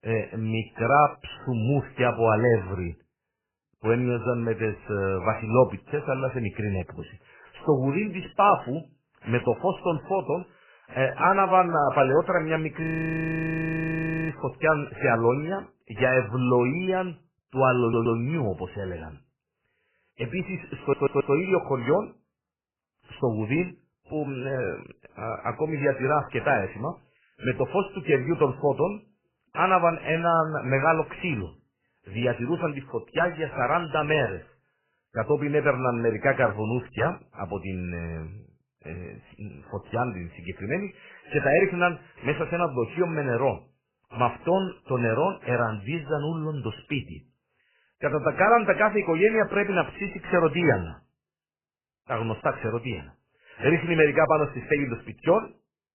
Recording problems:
garbled, watery; badly; nothing above 3 kHz
audio freezing; at 13 s for 1.5 s
audio stuttering; at 18 s and at 21 s

